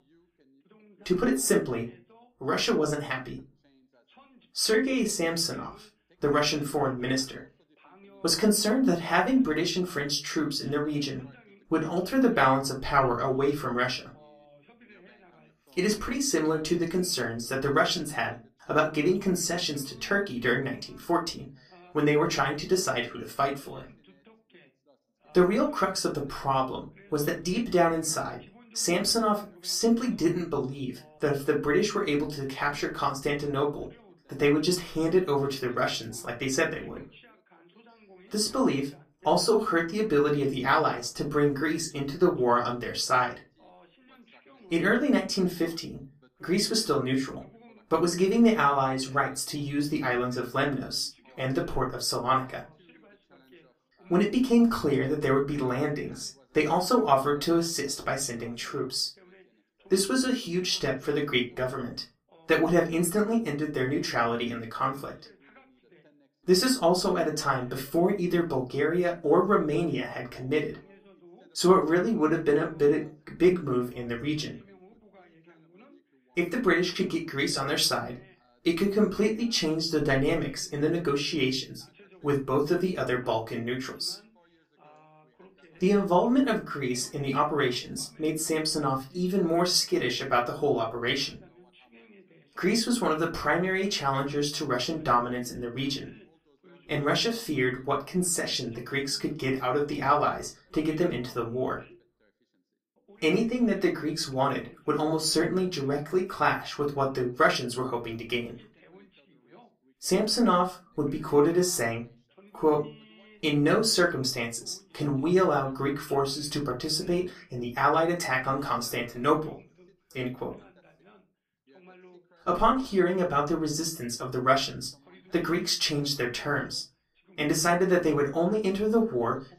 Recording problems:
off-mic speech; far
room echo; very slight; dies away in 0.2 s
background chatter; faint; throughout; 2 voices, 30 dB below the speech

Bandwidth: 15 kHz